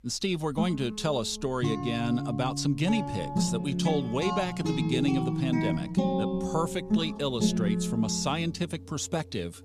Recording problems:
background music; loud; throughout; 1 dB below the speech

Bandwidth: 15 kHz